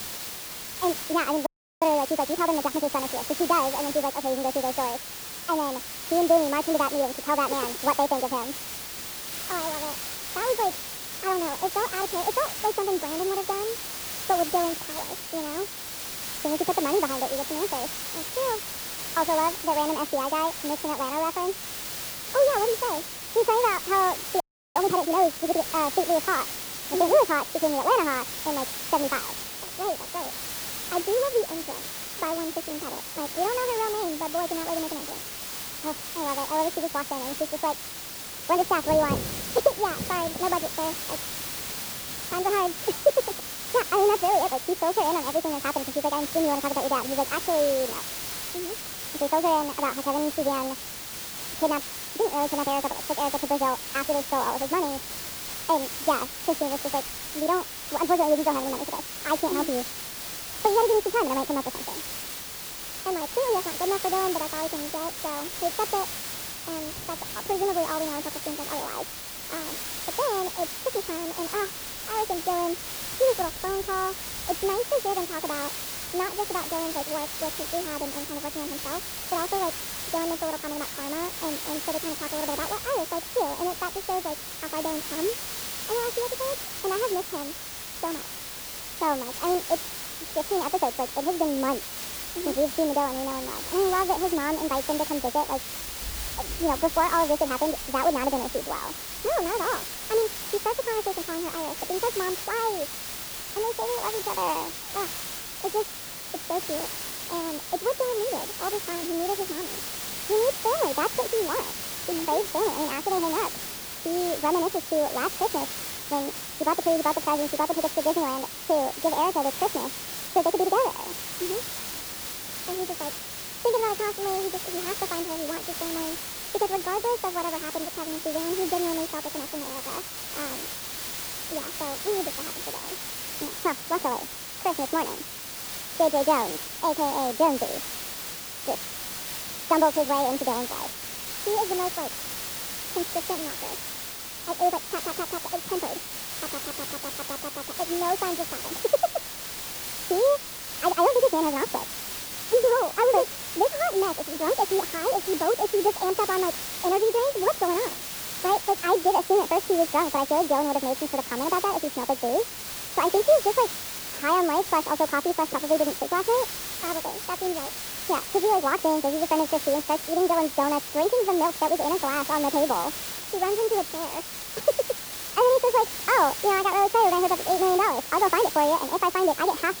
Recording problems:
muffled; very; fading above 2 kHz
wrong speed and pitch; too fast and too high; 1.5 times normal speed
hiss; loud; throughout; 6 dB below the speech
rain or running water; faint; throughout; 25 dB below the speech
audio freezing; at 1.5 s and at 24 s

